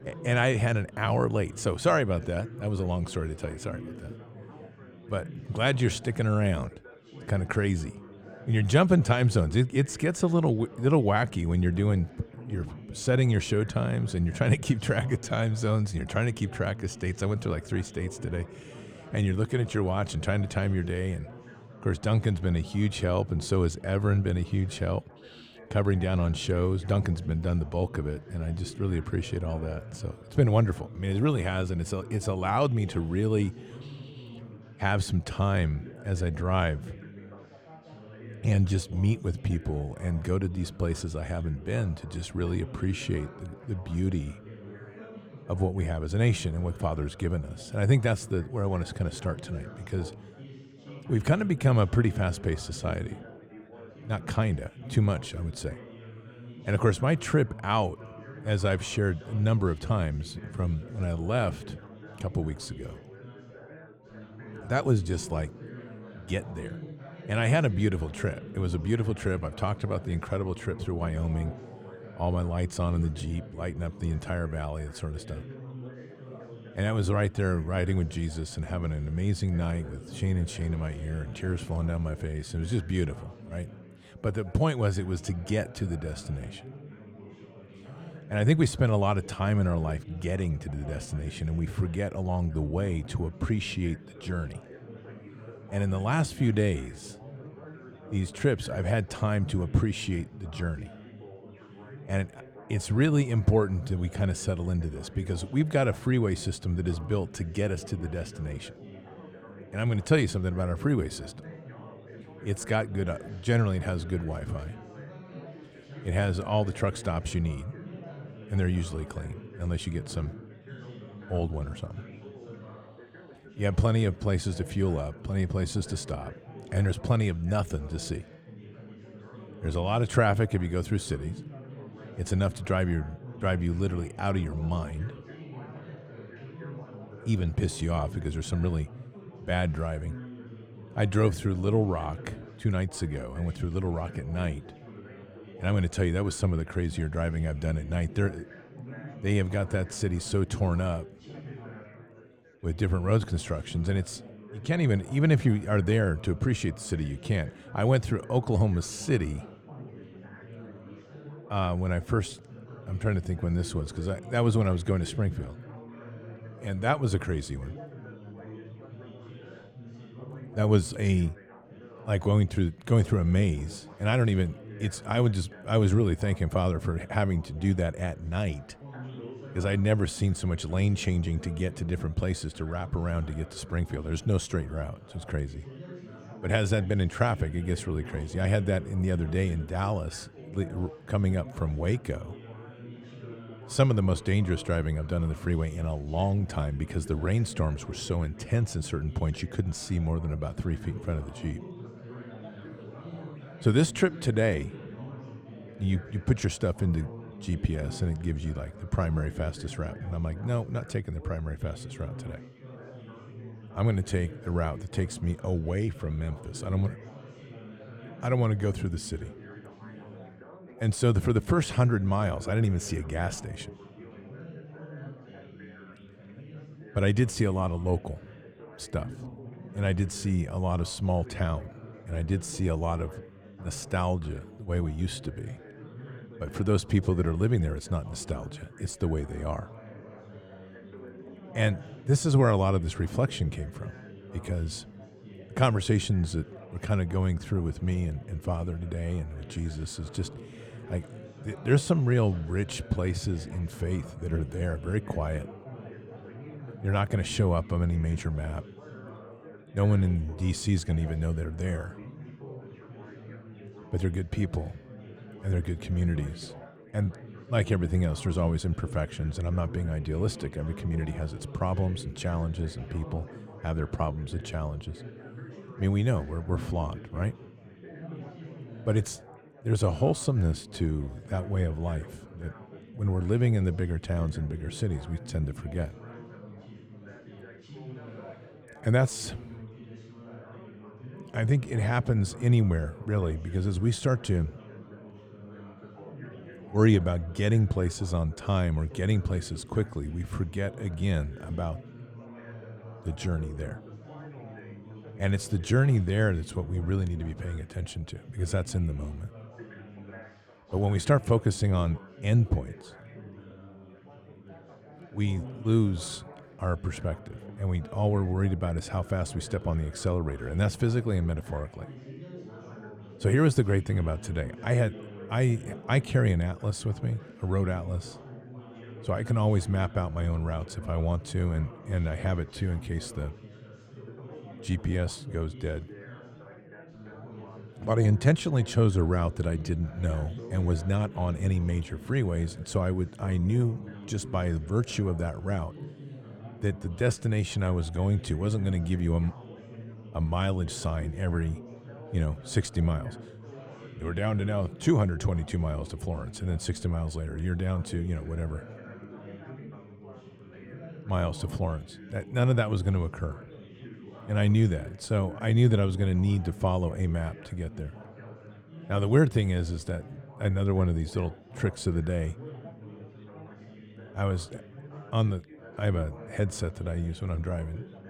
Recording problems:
muffled; slightly; fading above 3.5 kHz
chatter from many people; noticeable; throughout; 15 dB below the speech

